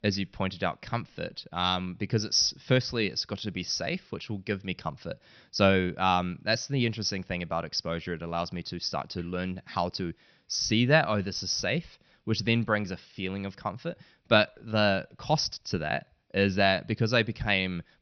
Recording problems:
high frequencies cut off; noticeable; nothing above 6 kHz

